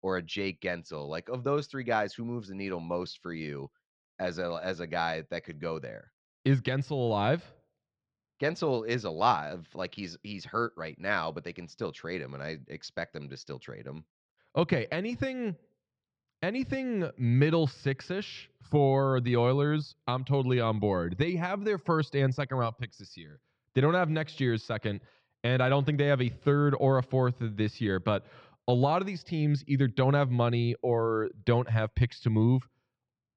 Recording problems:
muffled; very slightly; fading above 4.5 kHz

